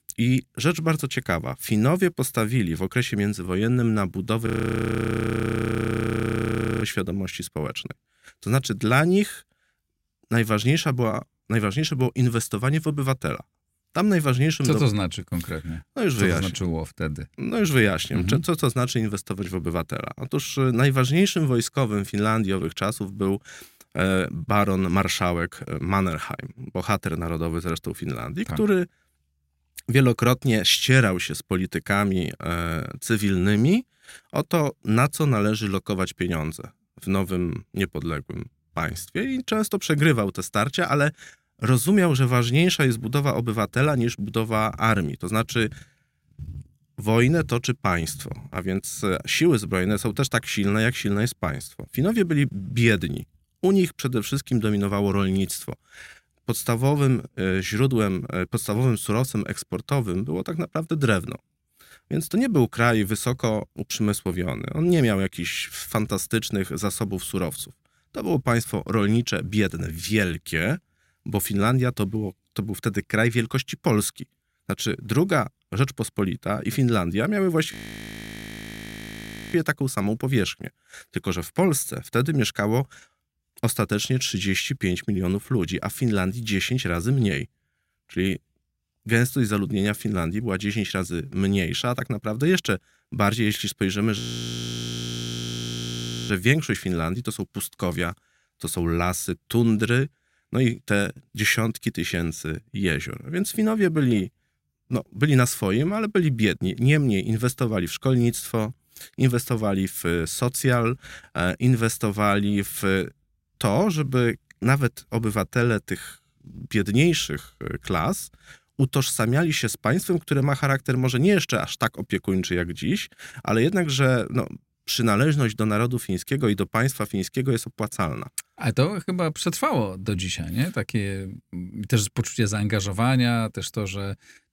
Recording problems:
audio freezing; at 4.5 s for 2.5 s, at 1:18 for 2 s and at 1:34 for 2 s

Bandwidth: 16 kHz